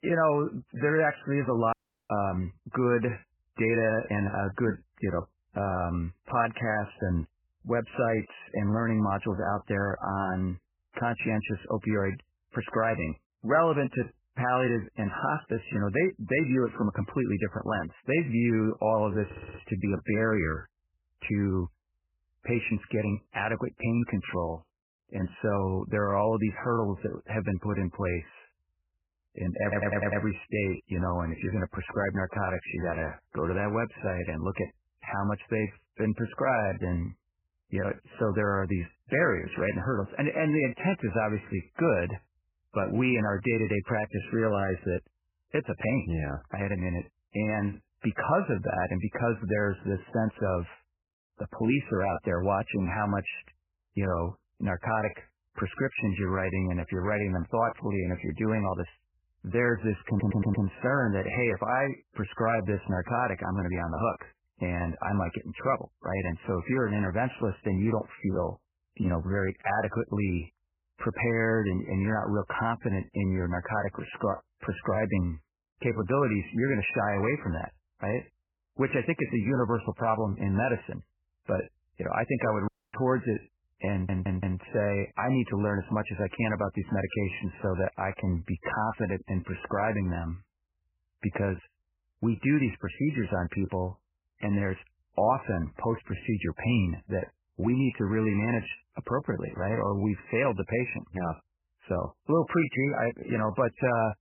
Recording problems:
garbled, watery; badly; nothing above 2.5 kHz
audio cutting out; at 1.5 s and at 1:23
audio stuttering; 4 times, first at 19 s

